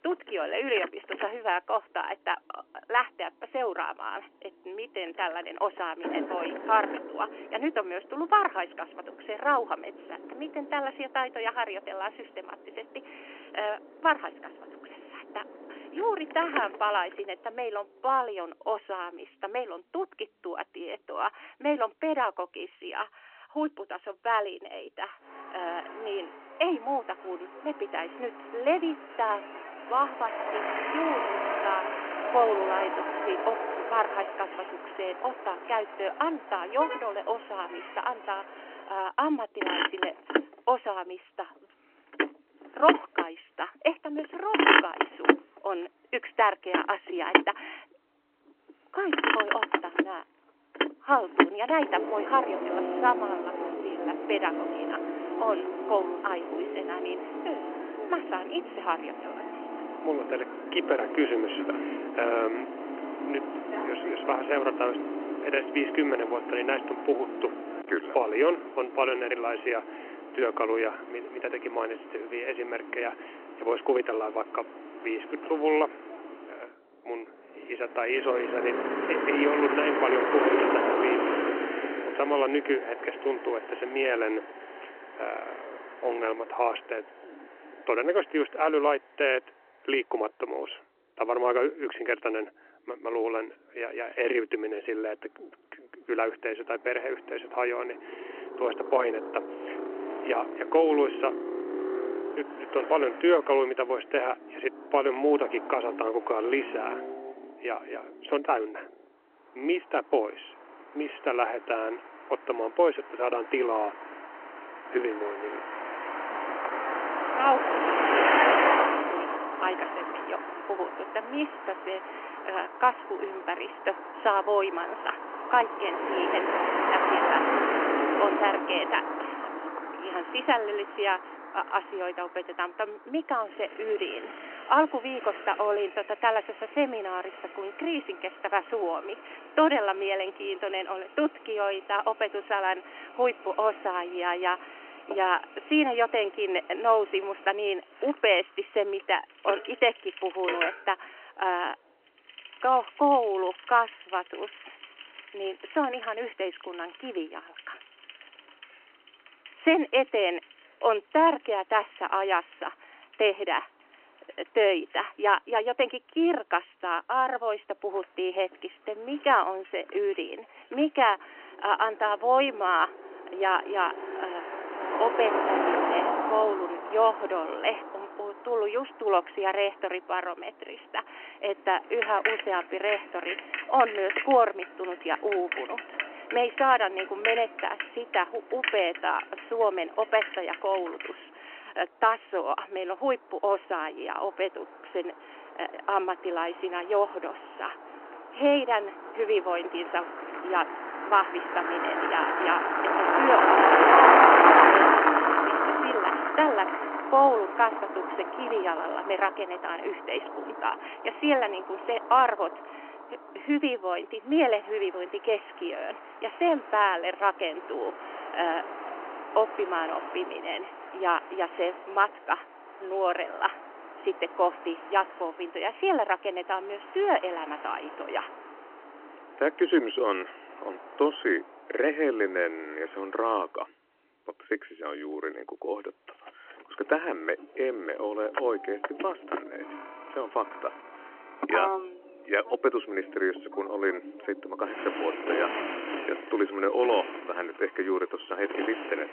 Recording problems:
phone-call audio; nothing above 3 kHz
traffic noise; loud; throughout; as loud as the speech

